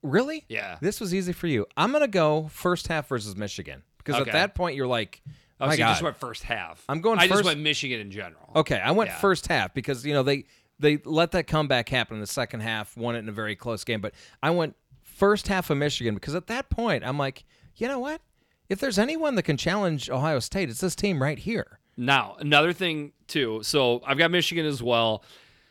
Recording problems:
none

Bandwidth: 18.5 kHz